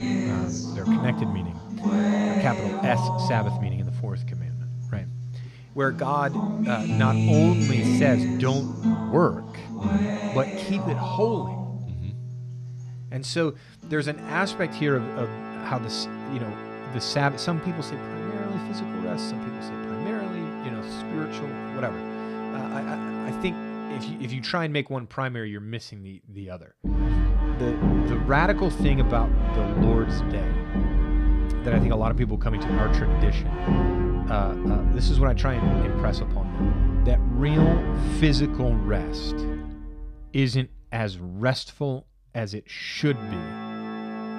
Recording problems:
background music; very loud; throughout; 1 dB above the speech

